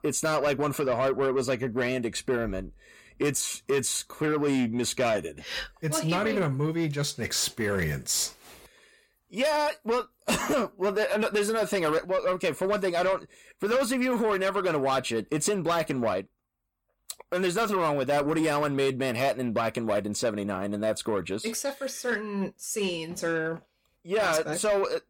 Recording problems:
distortion; slight; 10 dB below the speech

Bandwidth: 17.5 kHz